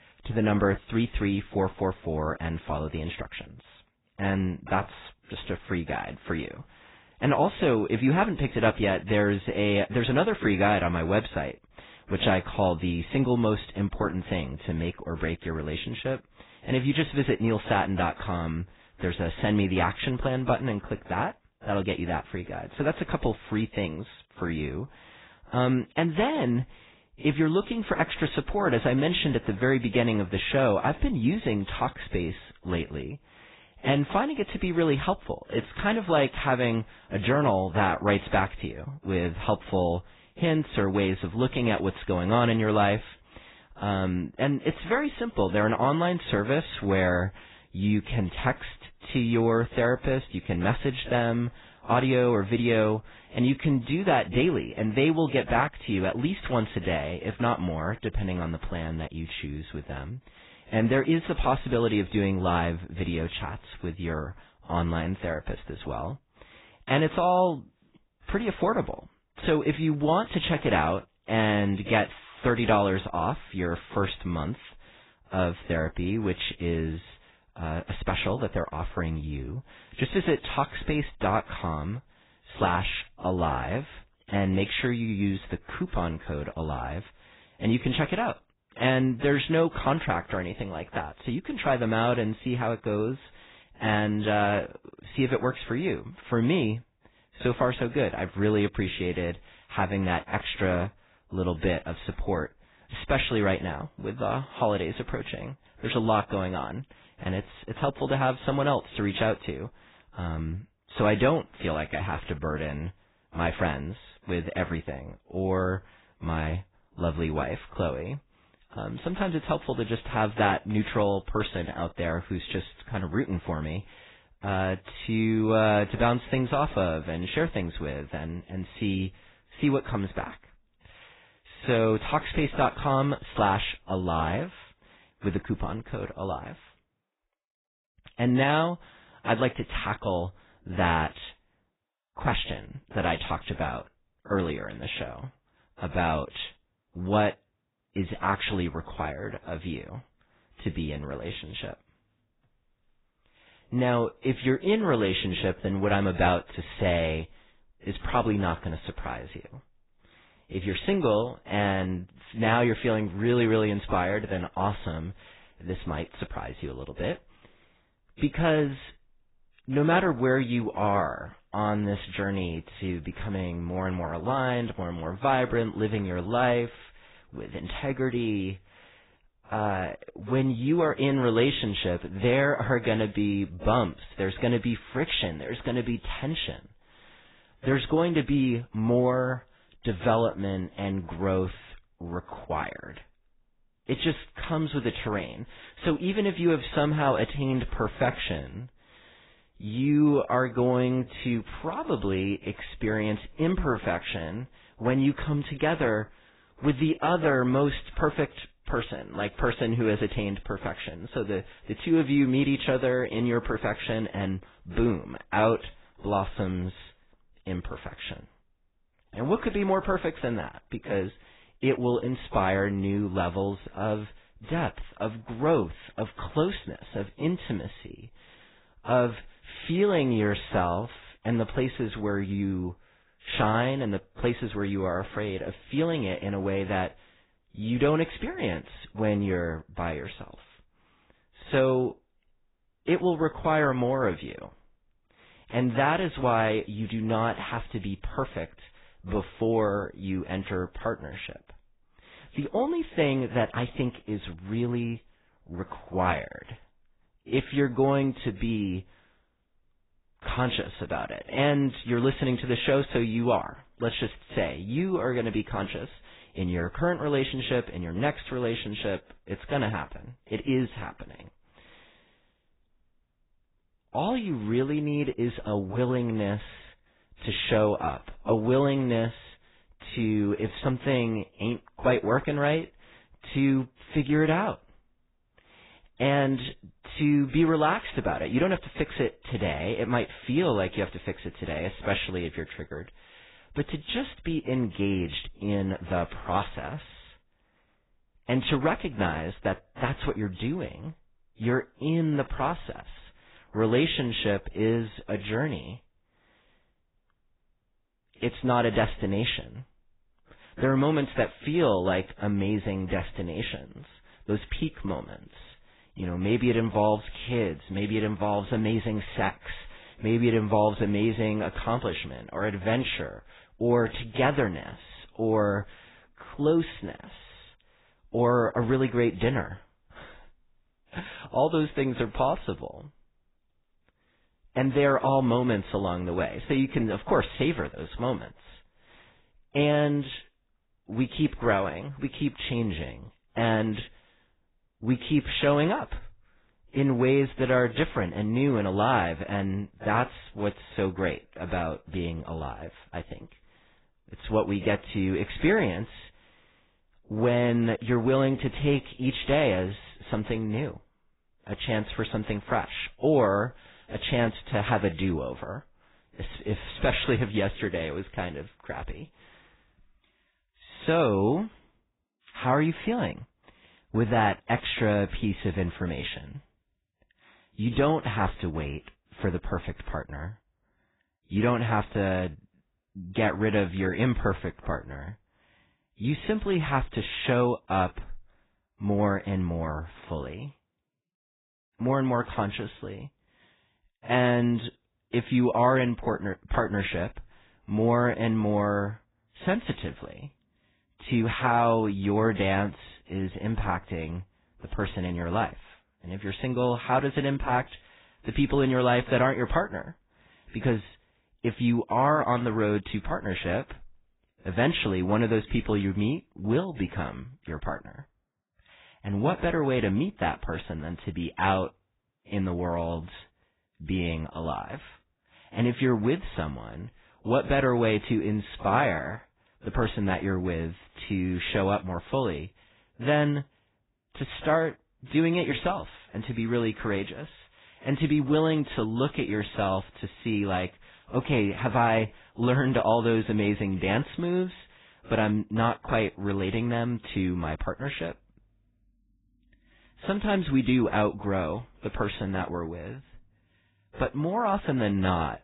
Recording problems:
garbled, watery; badly; nothing above 4 kHz

